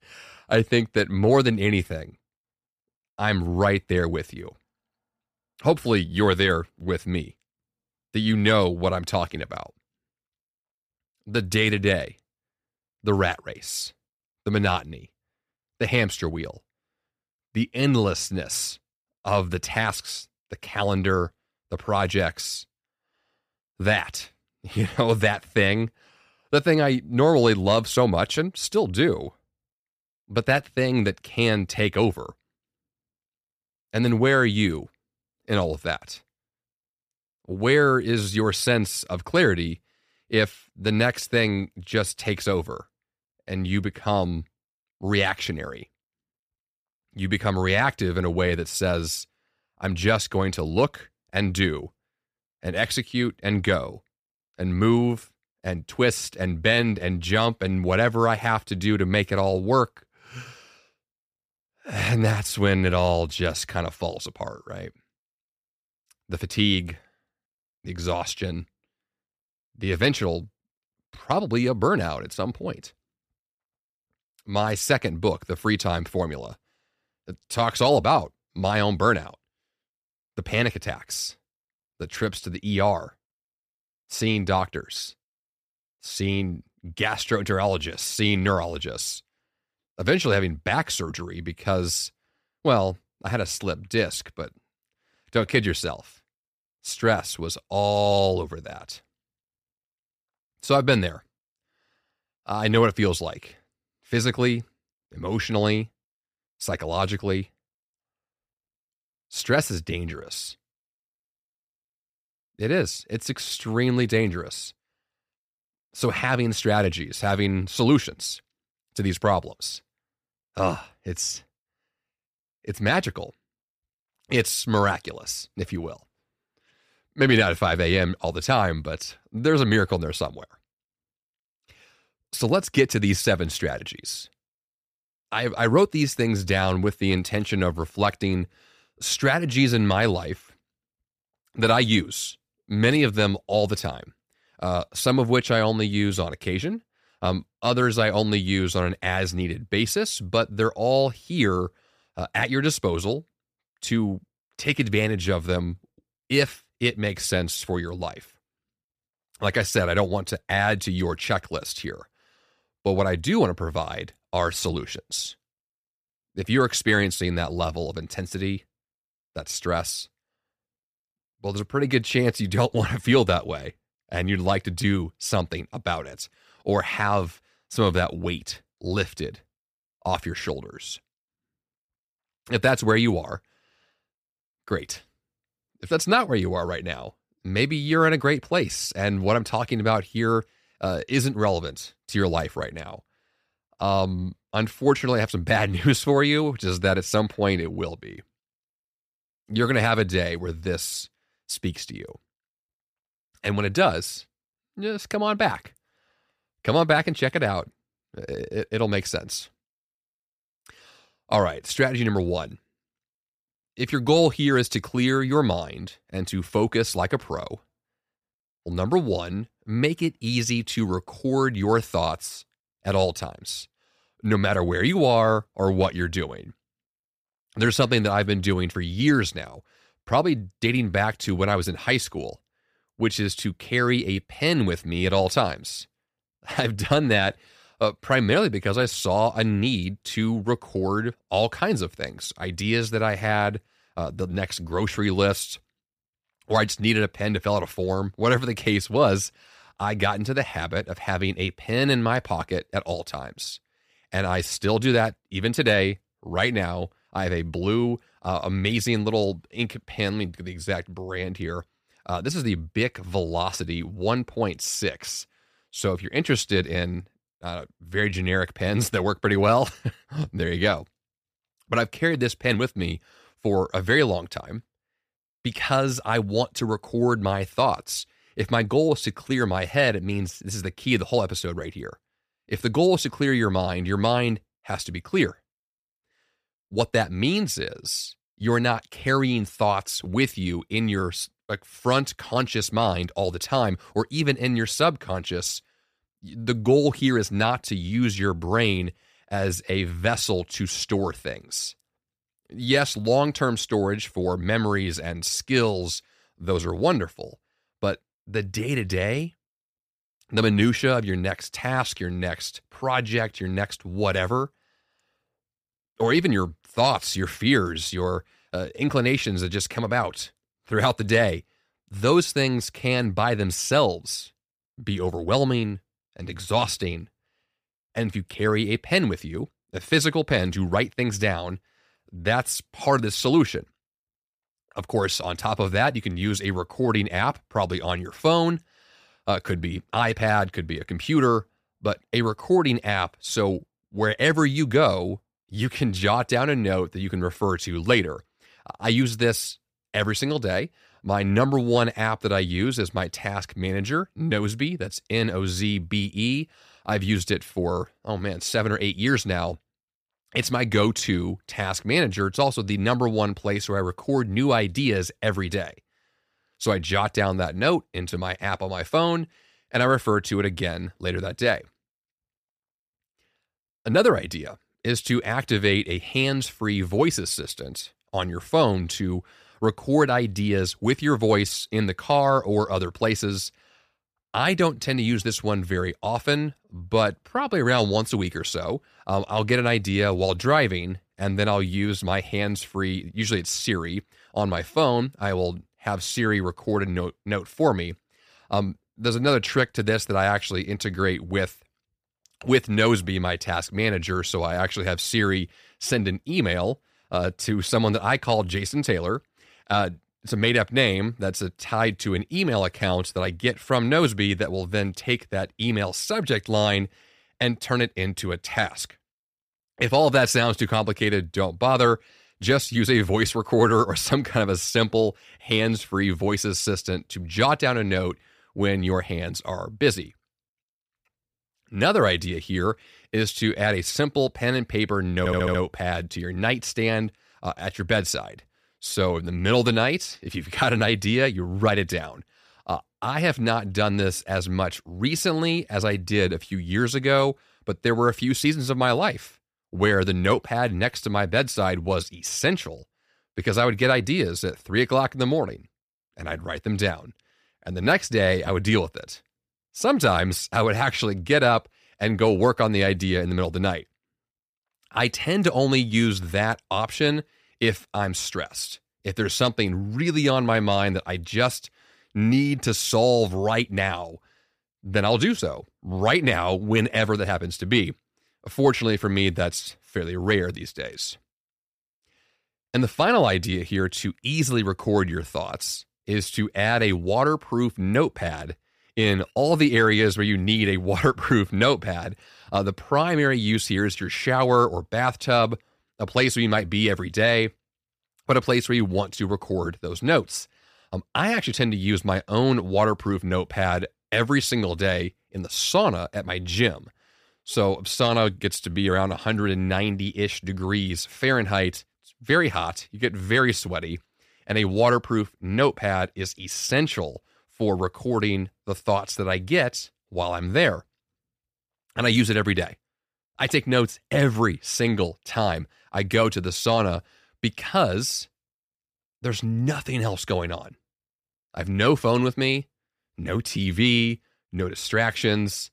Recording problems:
audio stuttering; at 7:15

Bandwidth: 15 kHz